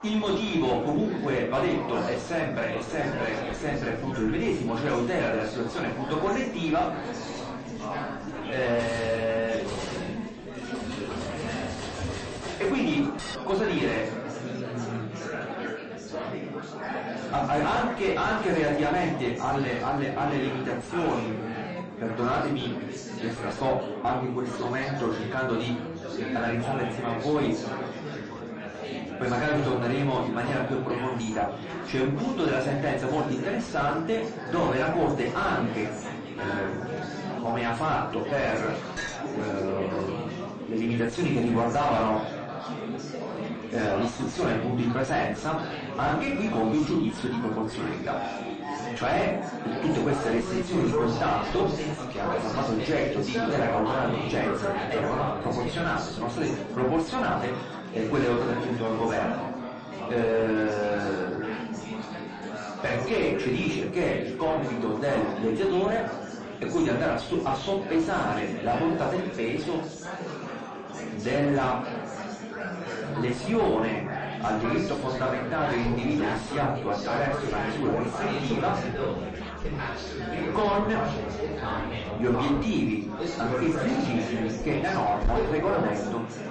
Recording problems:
distortion; heavy; 6 dB below the speech
room echo; slight; dies away in 0.4 s
off-mic speech; somewhat distant
garbled, watery; slightly; nothing above 8 kHz
chatter from many people; loud; throughout; 6 dB below the speech
background music; noticeable; from 48 s on; 20 dB below the speech
clattering dishes; noticeable; from 3 to 13 s, at 13 s and at 39 s; peak 6 dB below the speech

